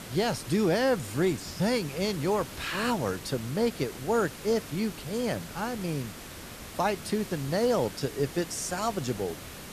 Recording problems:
hiss; noticeable; throughout; 10 dB below the speech

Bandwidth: 14.5 kHz